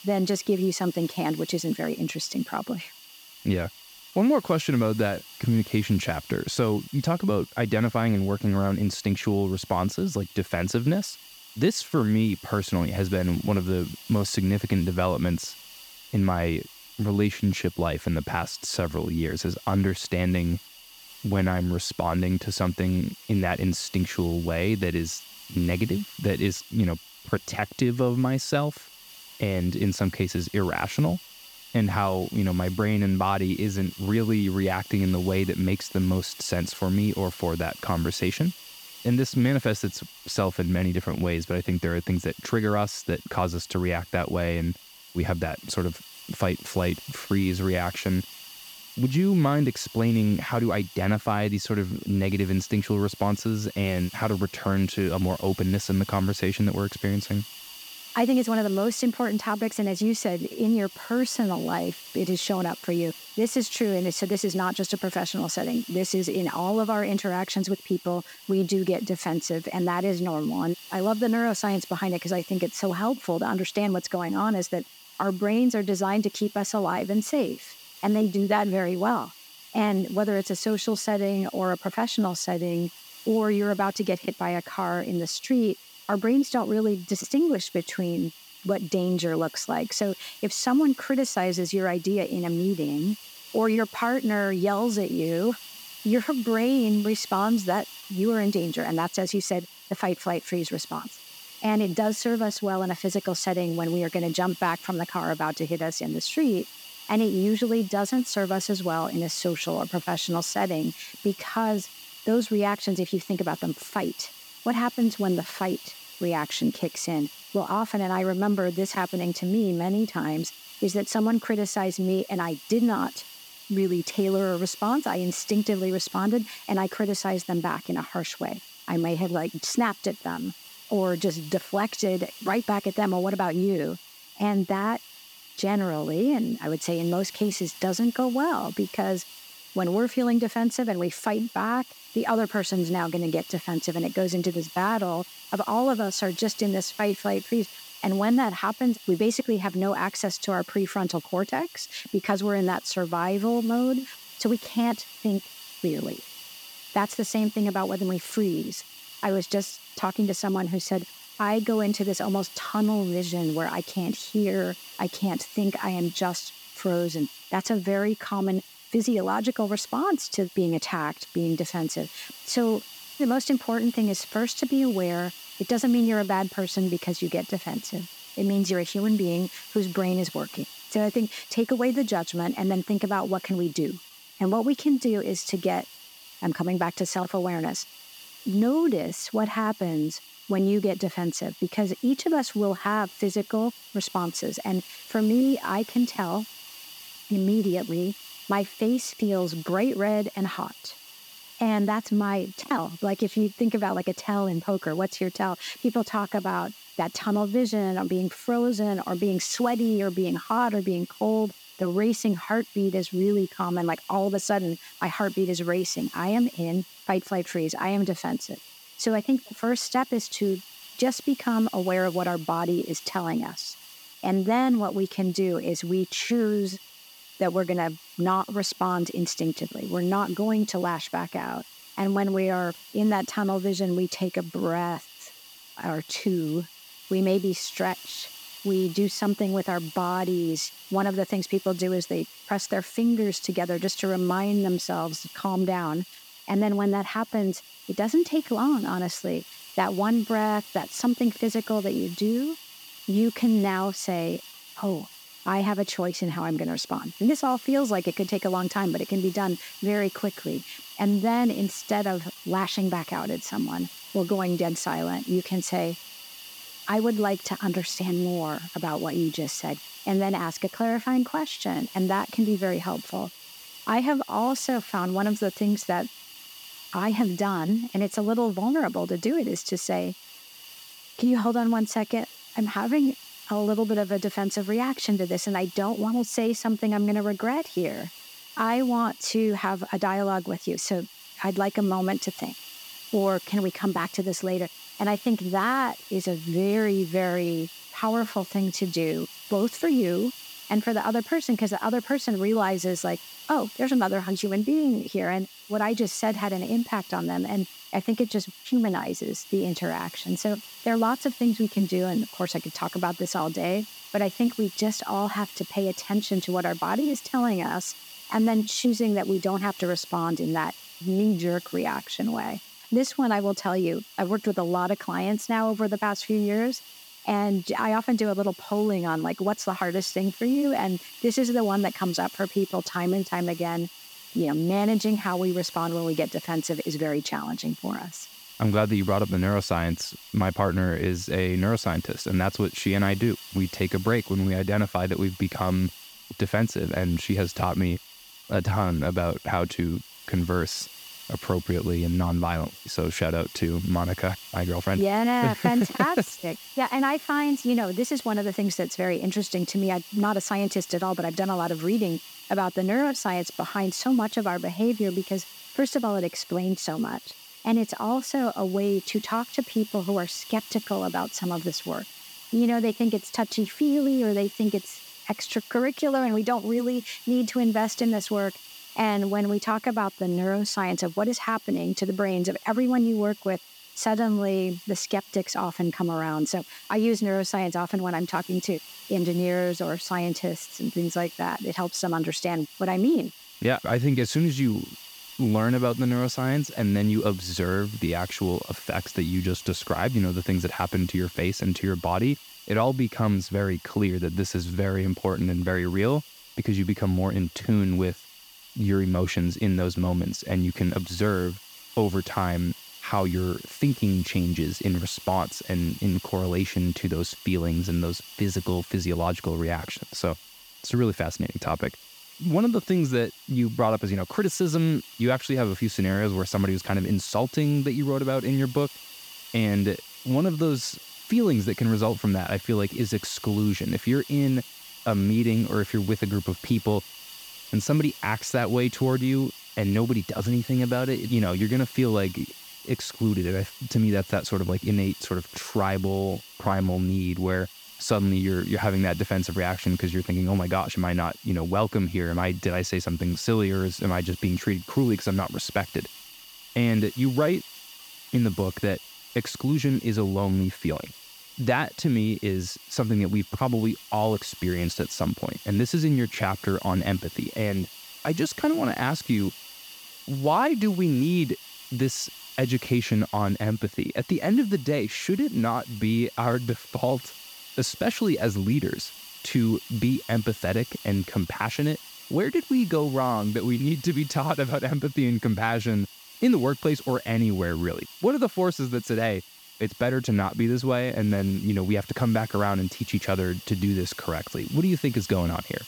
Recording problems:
hiss; noticeable; throughout; 15 dB below the speech

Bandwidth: 18.5 kHz